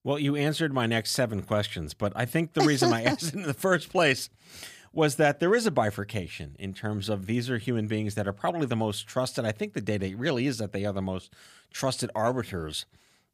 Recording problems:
none

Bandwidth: 15 kHz